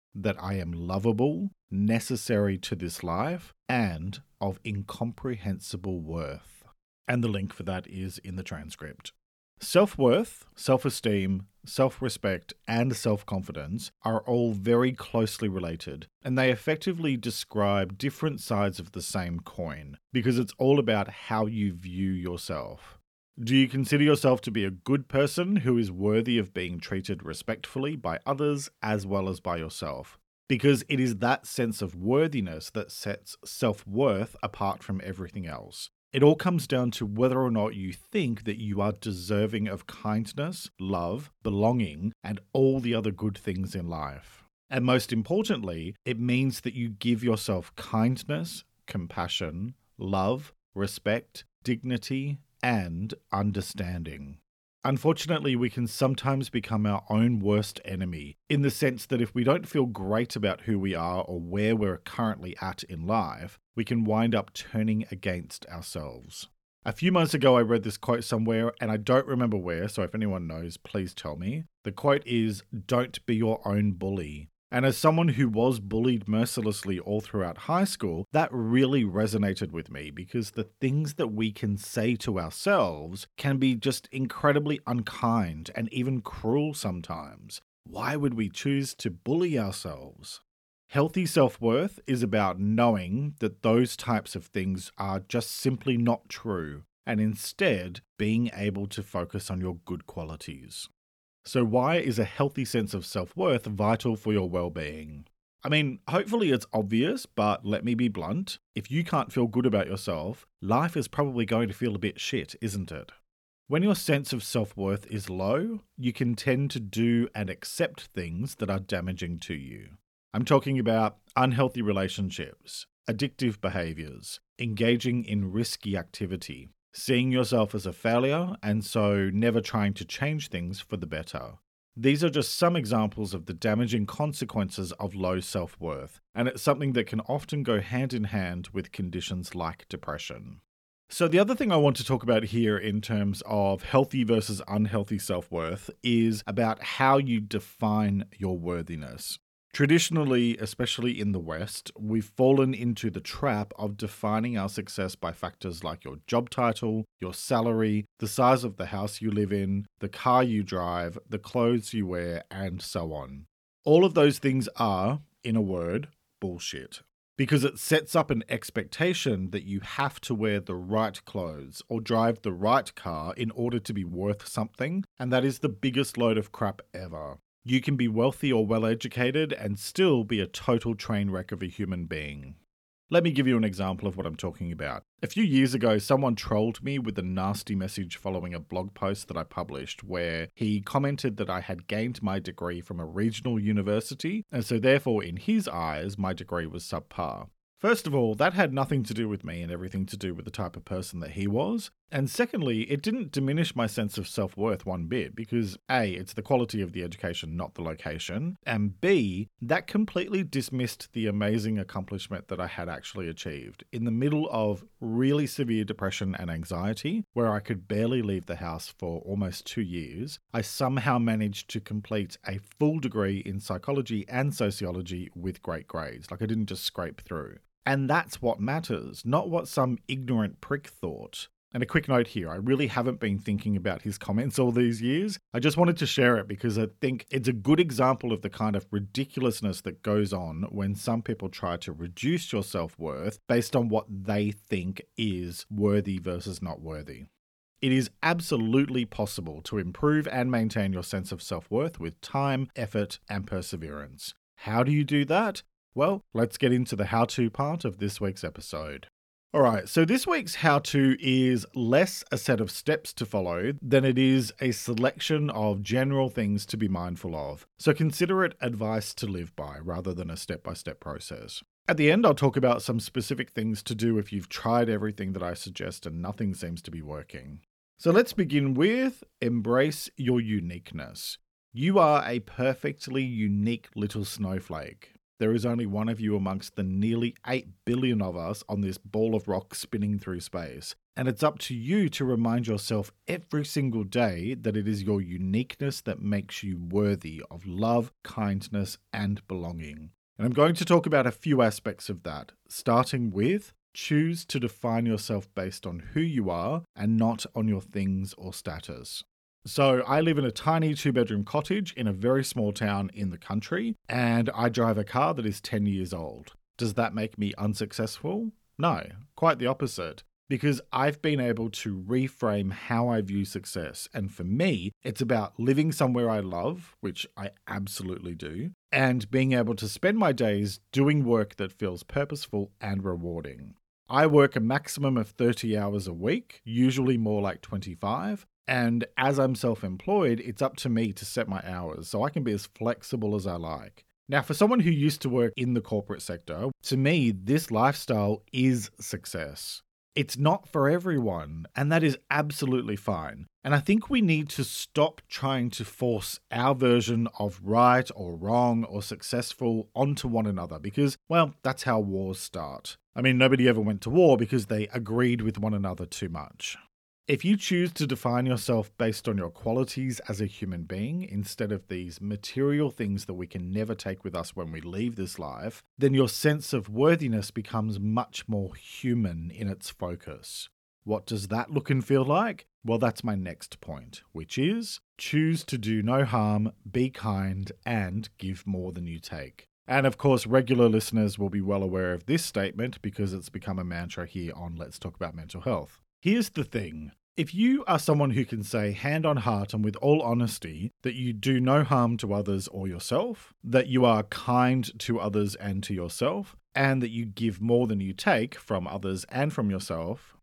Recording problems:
none

